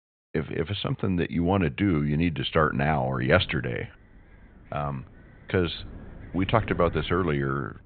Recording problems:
high frequencies cut off; severe; nothing above 4 kHz
wind noise on the microphone; occasional gusts; from 2.5 s on; 25 dB below the speech

